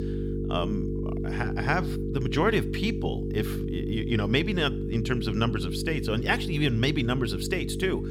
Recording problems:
electrical hum; loud; throughout; 50 Hz, 7 dB below the speech

